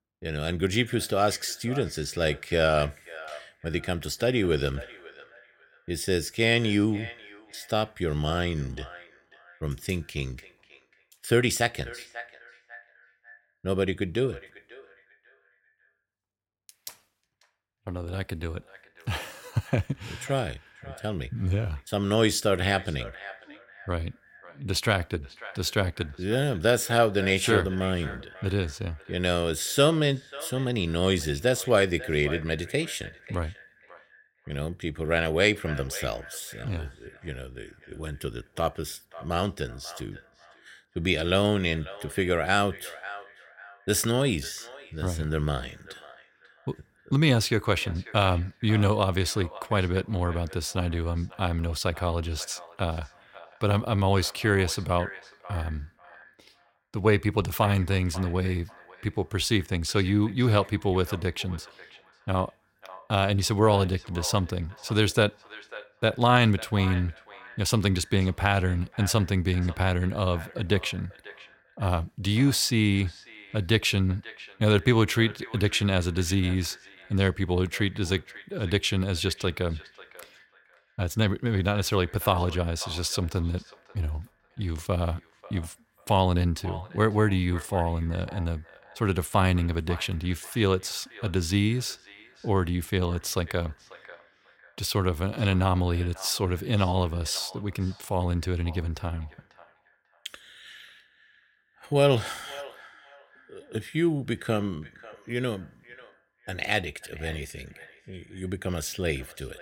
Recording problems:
echo of what is said; faint; throughout; 540 ms later, 20 dB below the speech

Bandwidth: 16.5 kHz